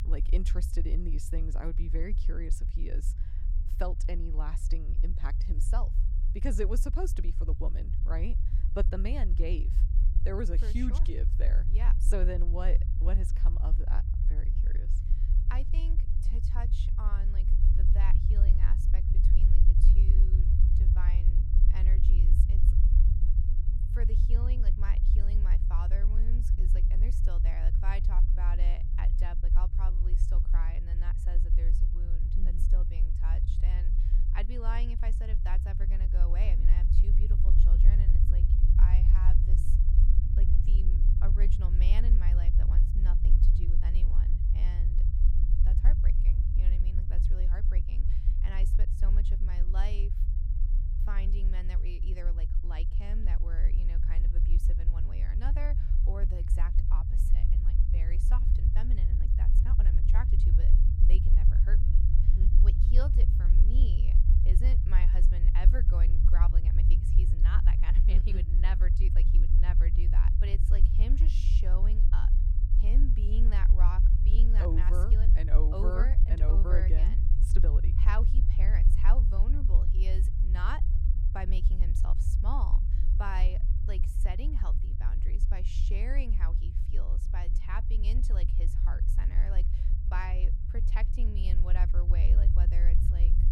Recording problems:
low rumble; loud; throughout; 4 dB below the speech

